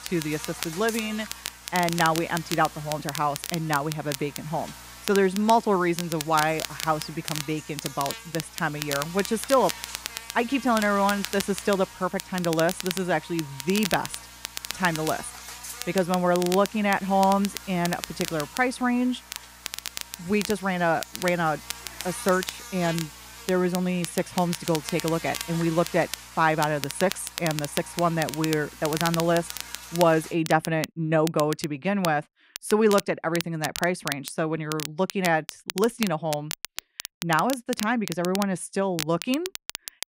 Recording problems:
crackle, like an old record; loud; 9 dB below the speech
electrical hum; noticeable; until 30 s; 60 Hz, 15 dB below the speech

